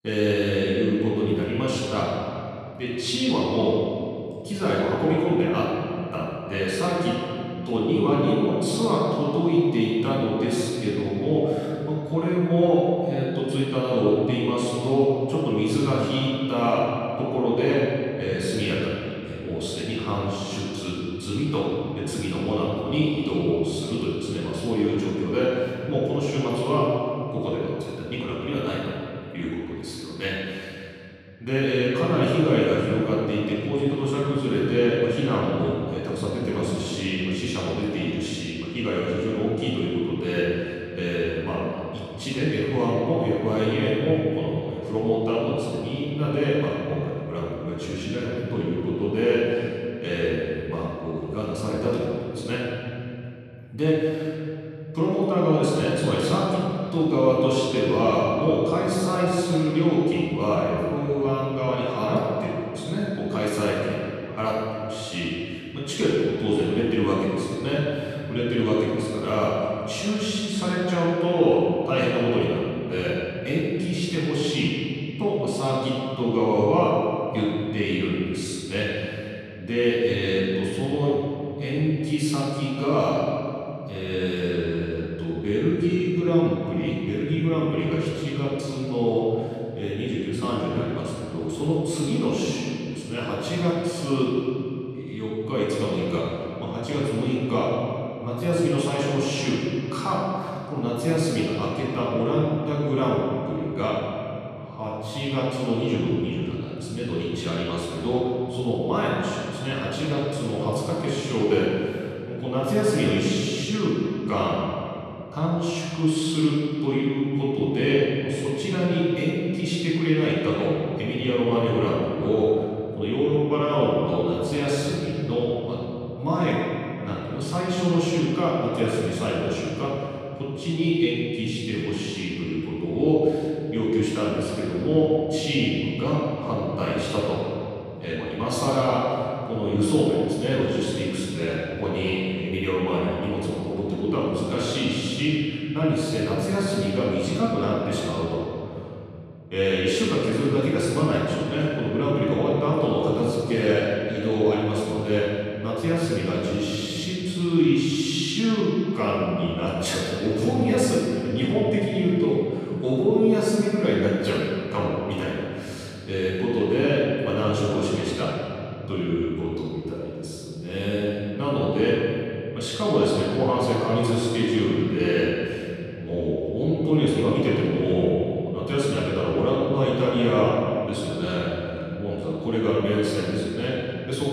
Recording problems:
room echo; strong; dies away in 3 s
off-mic speech; far

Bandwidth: 14 kHz